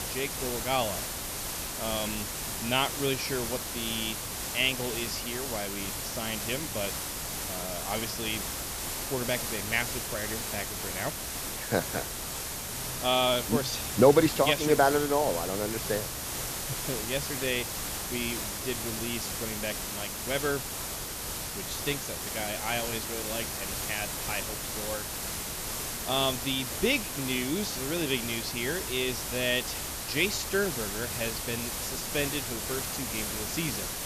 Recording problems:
high frequencies cut off; slight; nothing above 8 kHz
hiss; loud; throughout; 2 dB below the speech

